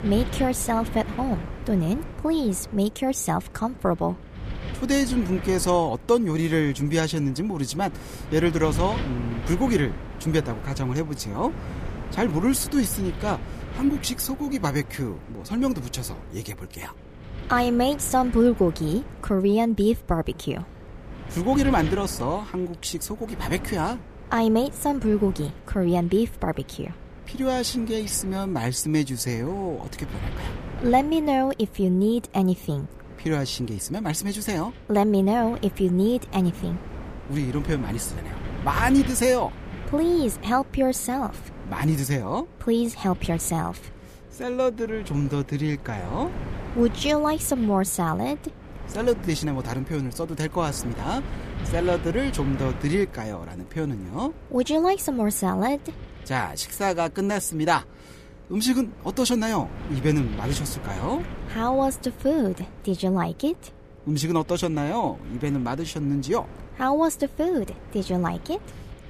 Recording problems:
wind noise on the microphone; occasional gusts; 15 dB below the speech
electrical hum; faint; throughout; 60 Hz, 30 dB below the speech

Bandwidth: 14.5 kHz